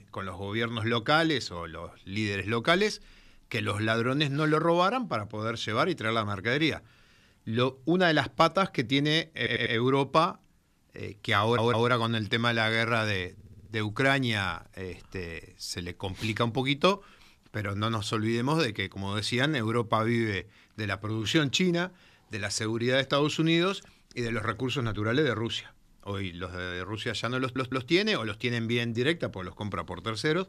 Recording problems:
audio stuttering; 4 times, first at 9.5 s

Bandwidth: 14 kHz